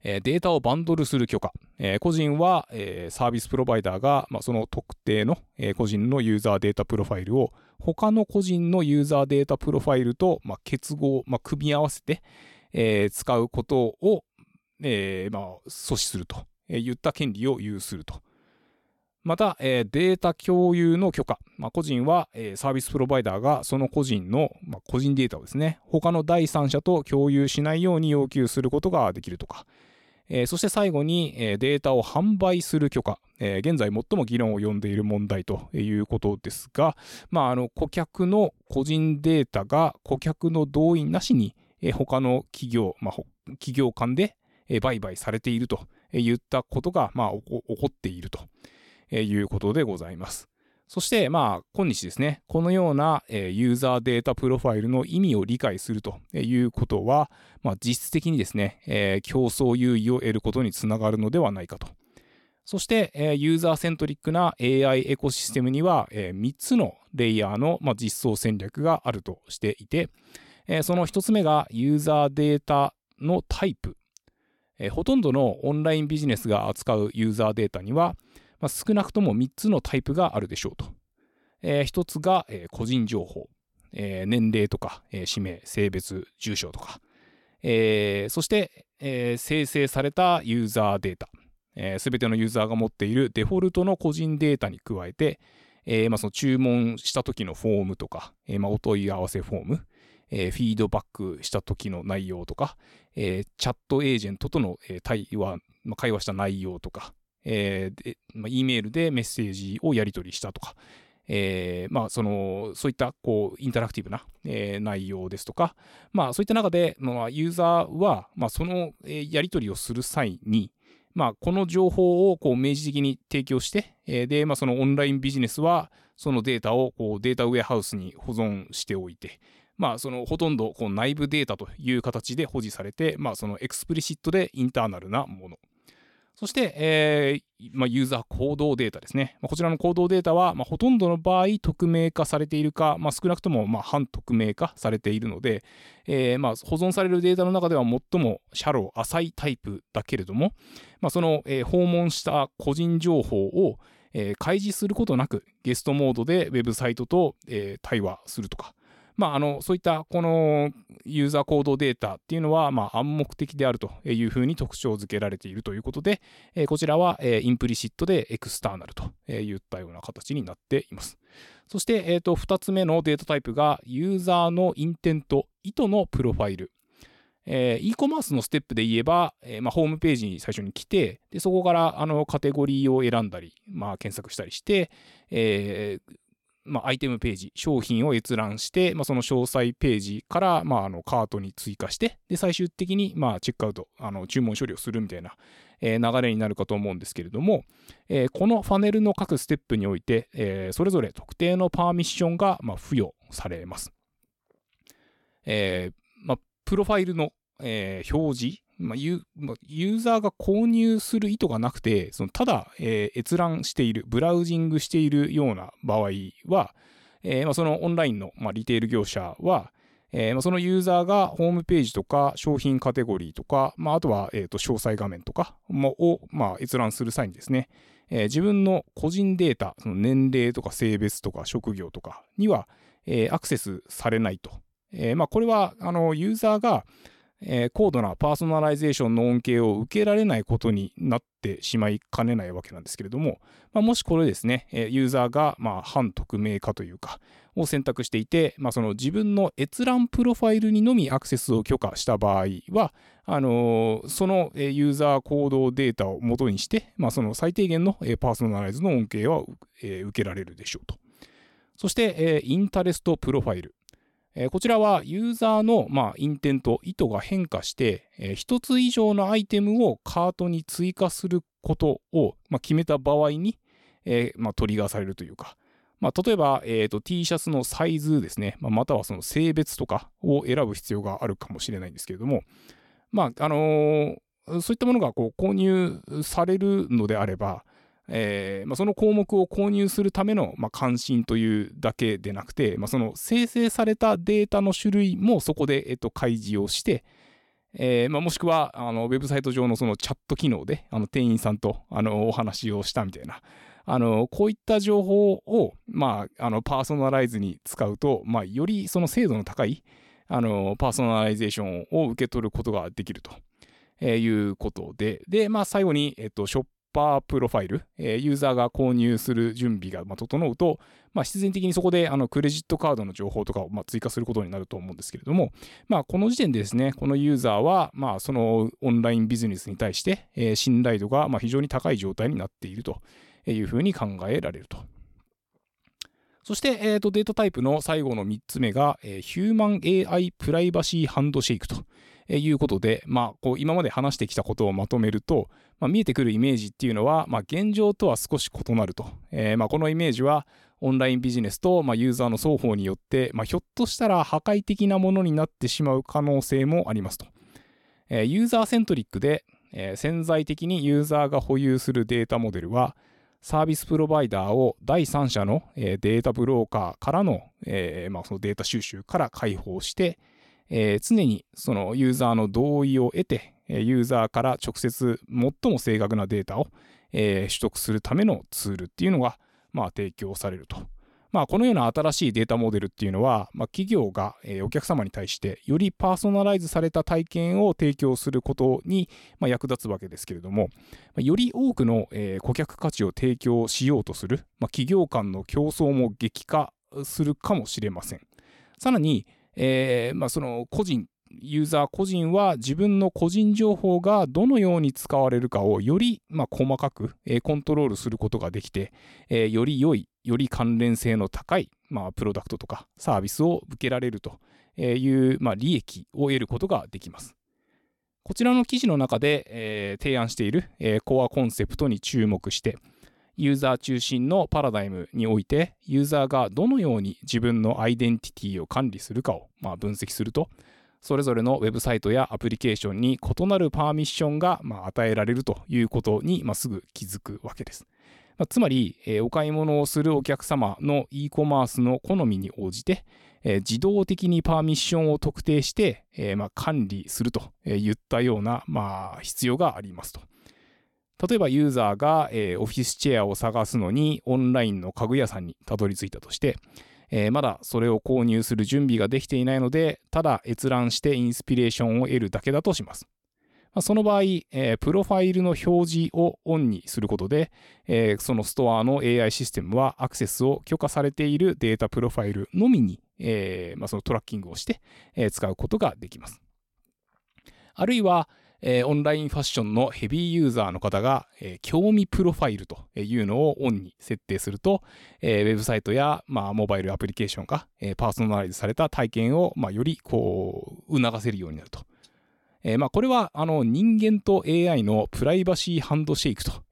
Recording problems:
none

